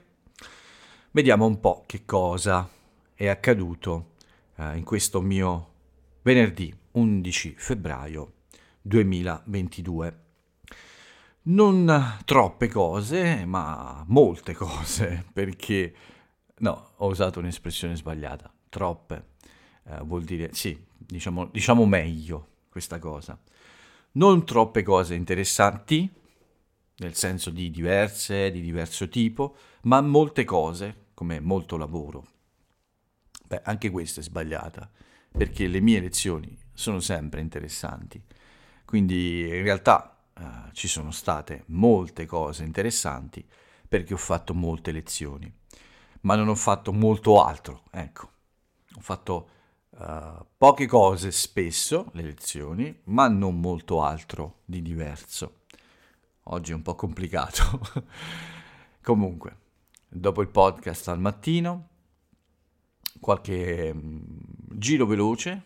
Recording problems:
none

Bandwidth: 16.5 kHz